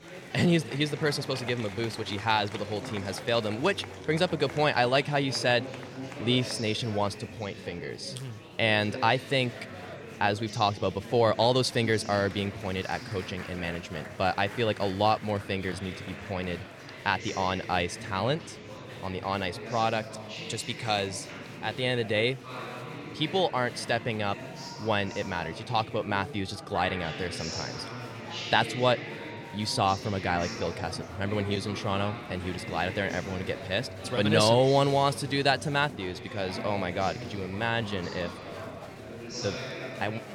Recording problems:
murmuring crowd; noticeable; throughout; 10 dB below the speech

